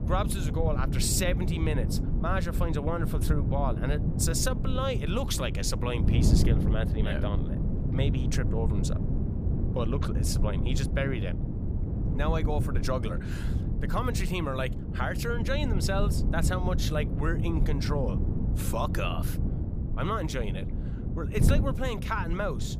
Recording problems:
wind noise on the microphone; heavy; 7 dB below the speech

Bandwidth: 15 kHz